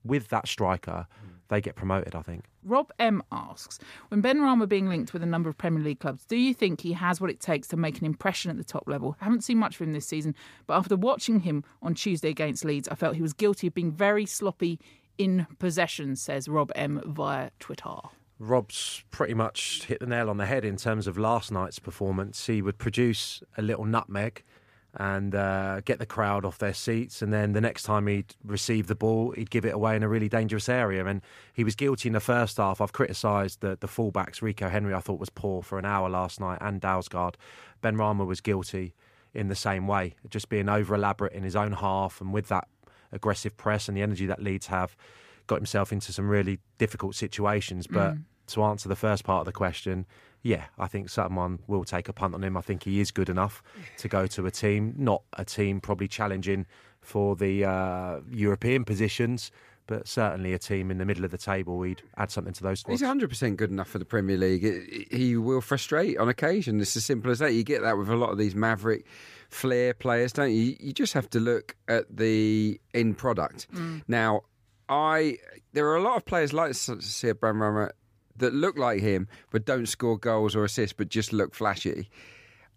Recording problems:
none

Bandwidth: 15 kHz